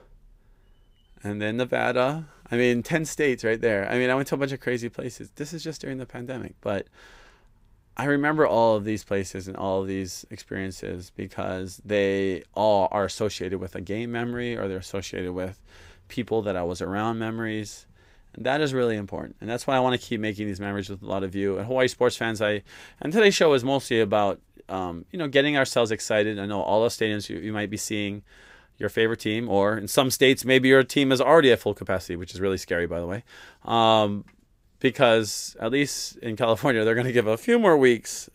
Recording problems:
none

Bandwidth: 15.5 kHz